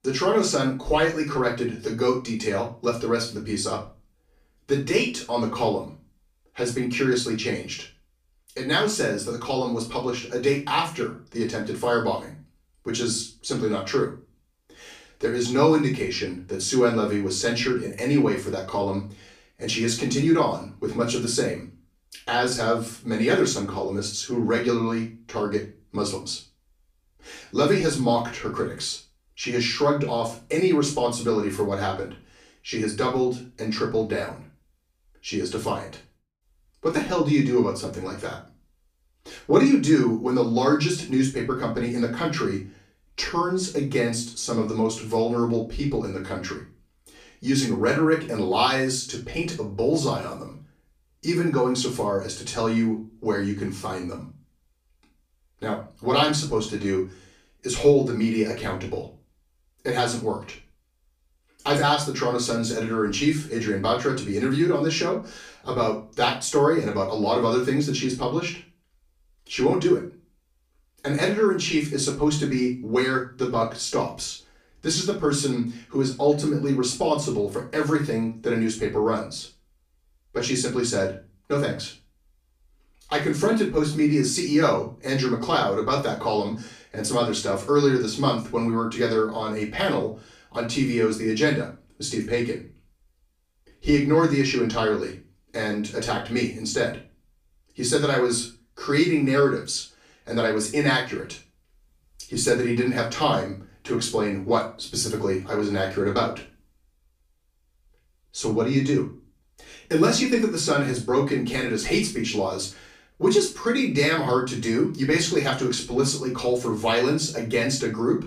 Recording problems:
off-mic speech; far
room echo; slight; dies away in 0.3 s

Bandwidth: 15 kHz